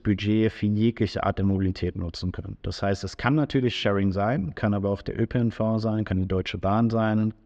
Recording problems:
muffled; very slightly; fading above 4 kHz

